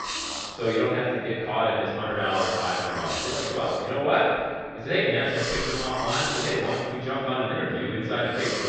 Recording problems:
room echo; strong; dies away in 1.9 s
off-mic speech; far
muffled; slightly; fading above 4.5 kHz
high frequencies cut off; slight; nothing above 8 kHz
hiss; loud; throughout; 6 dB below the speech

